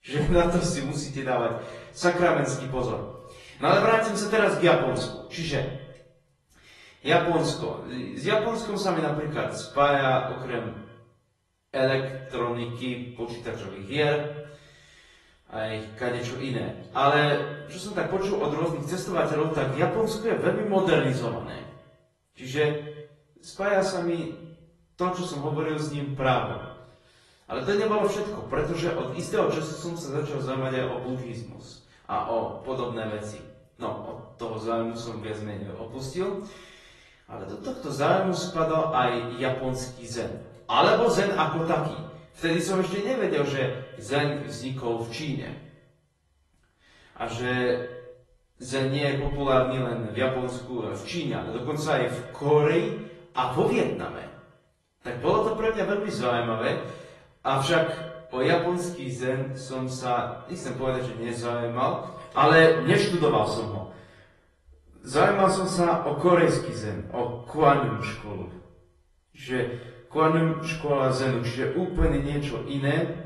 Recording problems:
off-mic speech; far
echo of what is said; noticeable; throughout; 110 ms later, 15 dB below the speech
room echo; slight; dies away in 0.5 s
garbled, watery; slightly; nothing above 11 kHz

